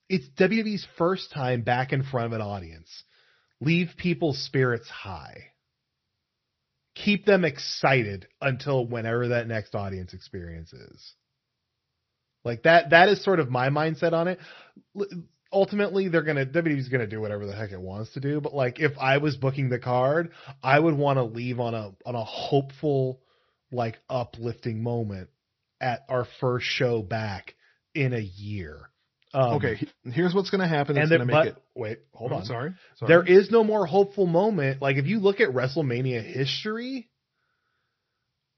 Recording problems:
high frequencies cut off; noticeable; nothing above 5.5 kHz
garbled, watery; slightly

